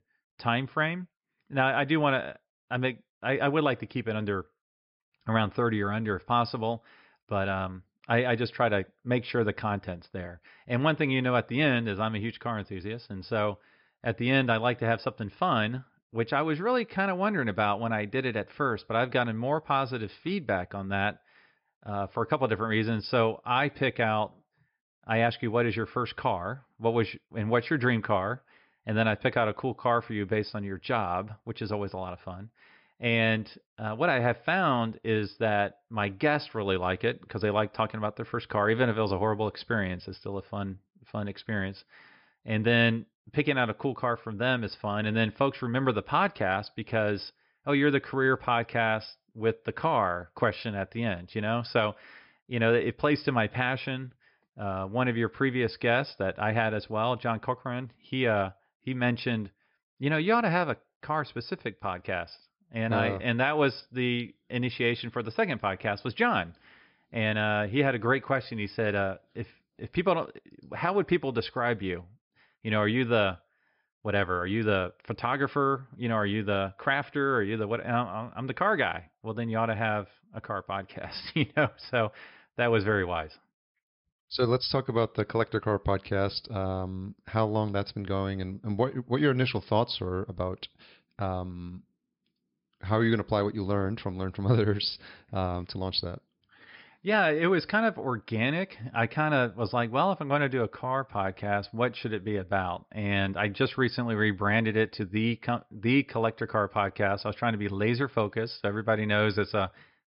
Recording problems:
high frequencies cut off; noticeable; nothing above 5.5 kHz

